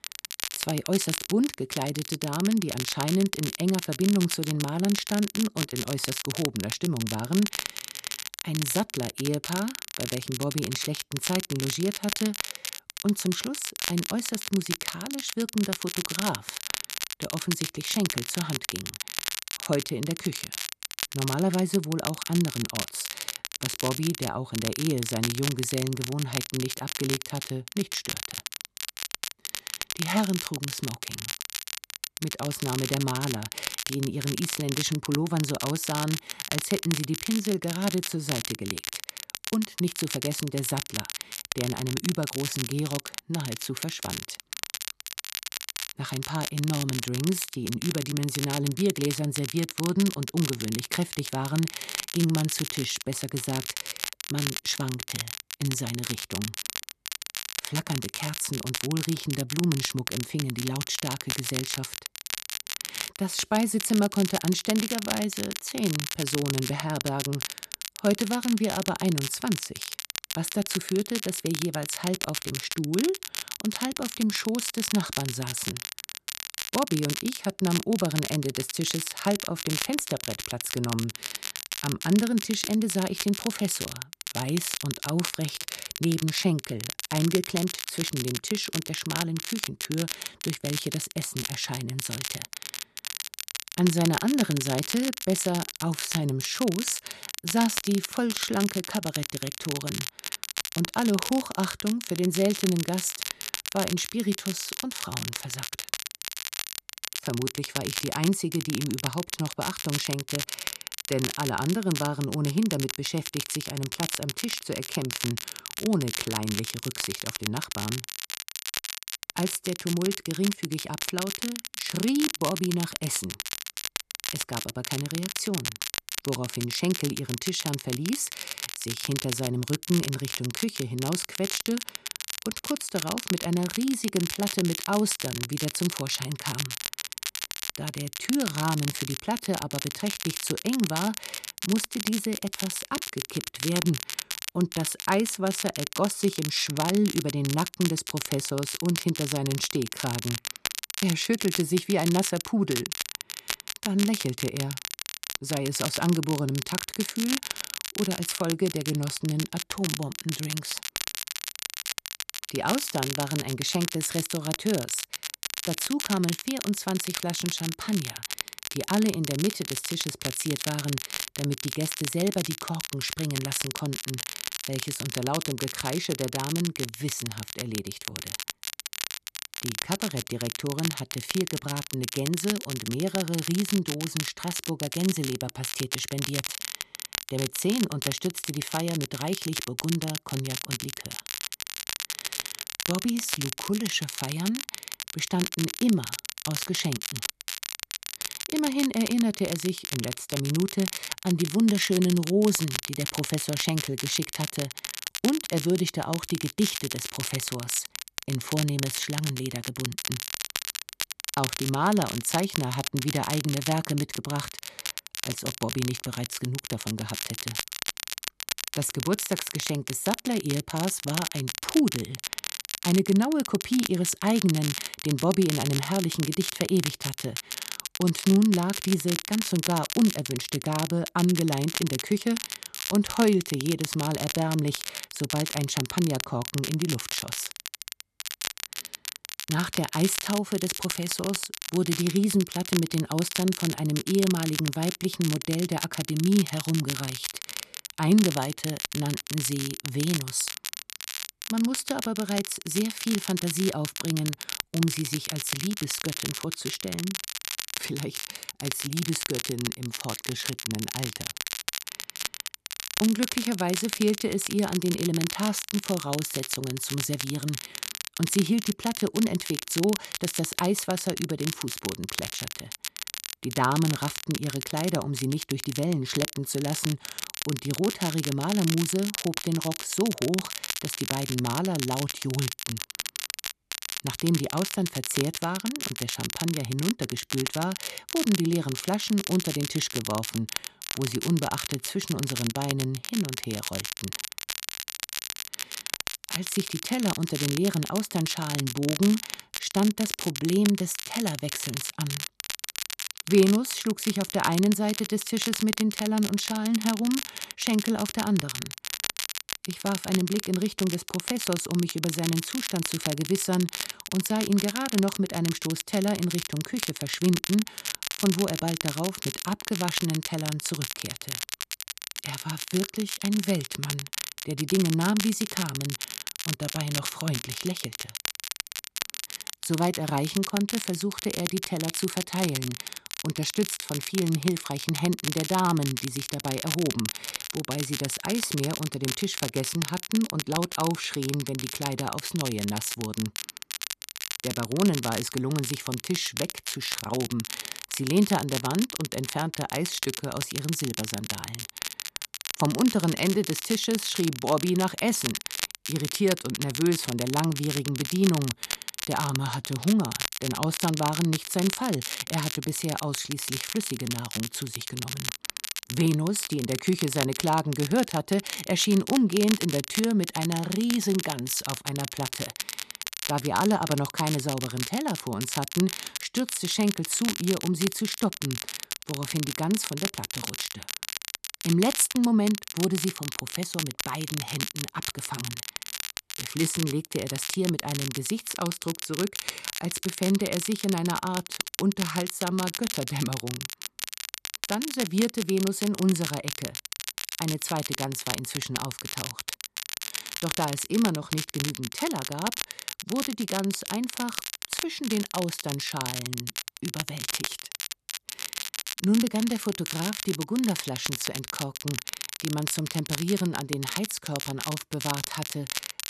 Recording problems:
crackle, like an old record; loud; 4 dB below the speech

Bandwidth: 13.5 kHz